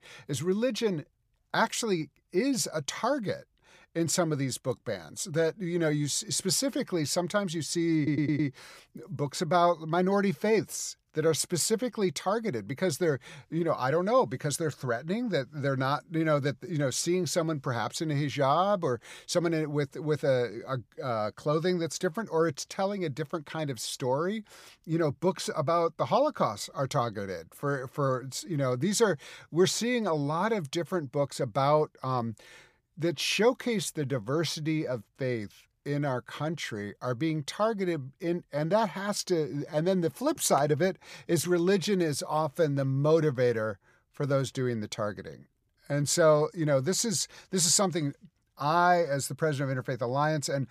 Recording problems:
audio stuttering; at 8 s

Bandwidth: 15 kHz